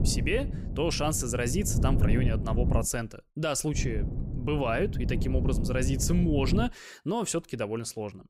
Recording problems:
wind noise on the microphone; heavy; until 3 s and from 4 to 6.5 s; 10 dB below the speech

